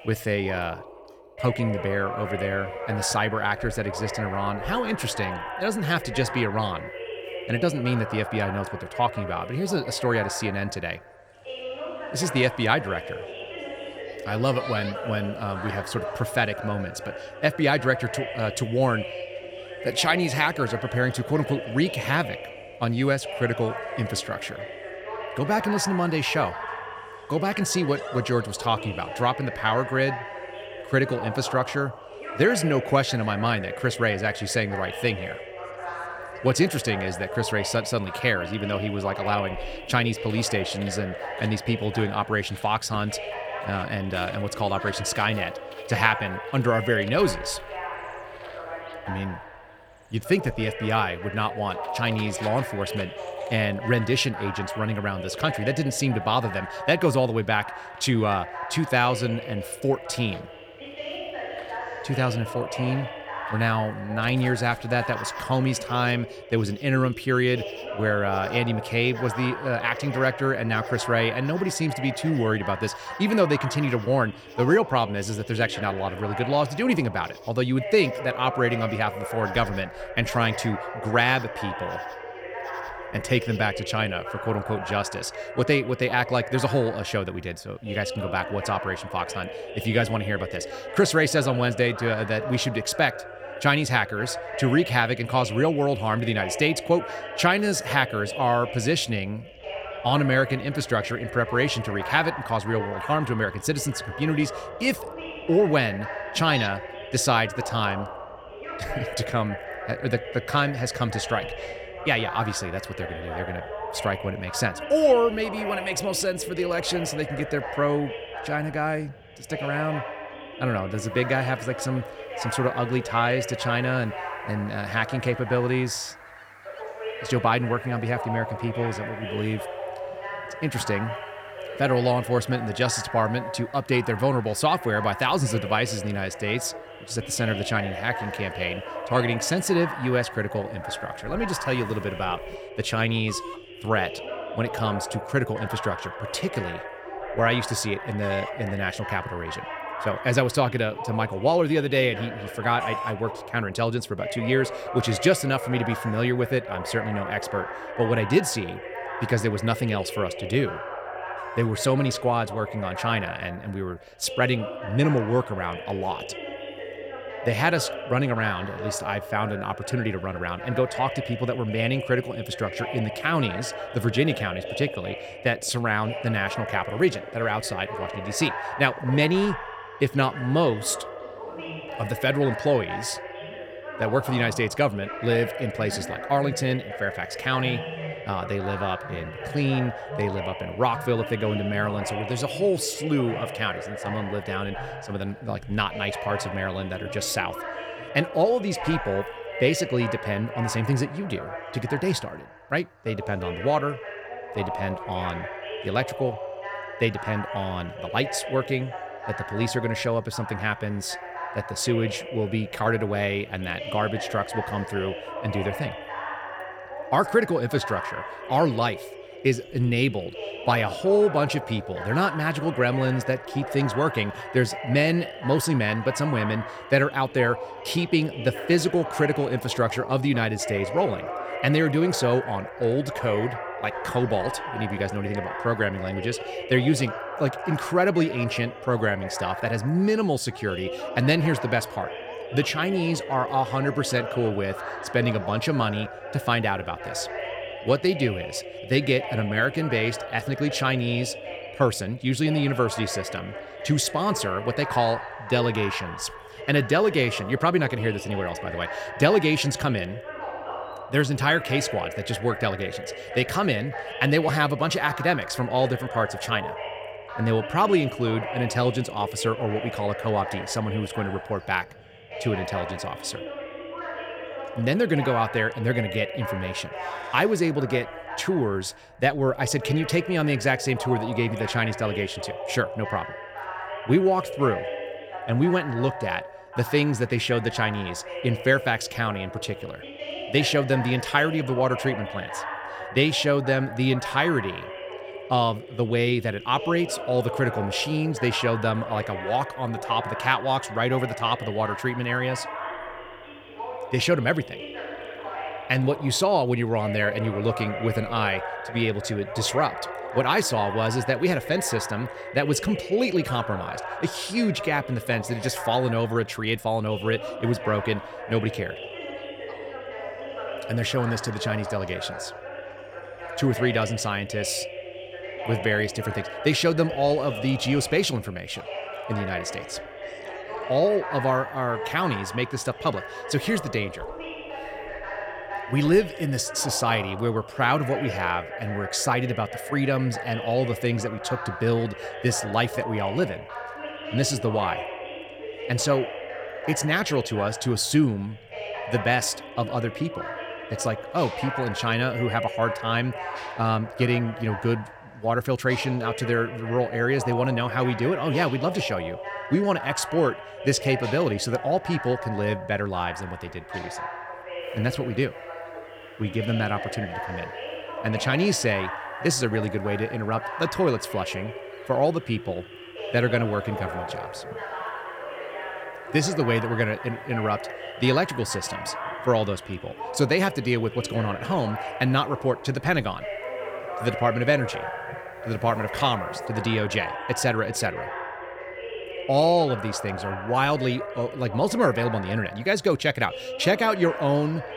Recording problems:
voice in the background; loud; throughout; 9 dB below the speech
animal sounds; faint; throughout; 20 dB below the speech

